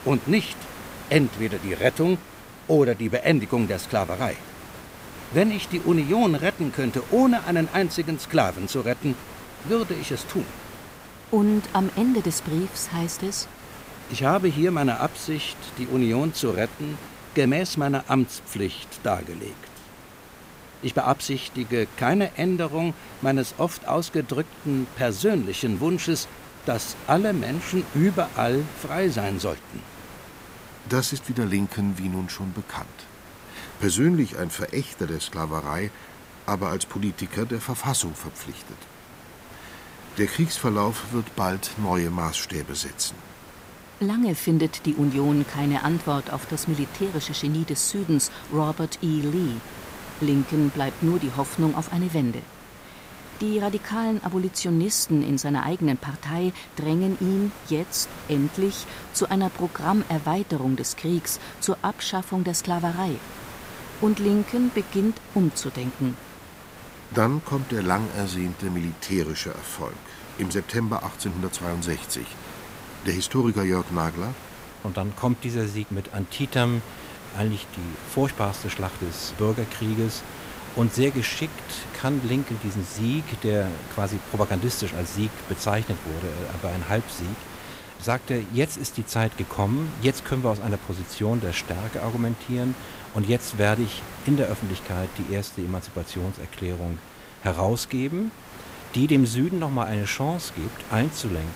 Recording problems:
hiss; noticeable; throughout; 15 dB below the speech

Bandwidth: 15.5 kHz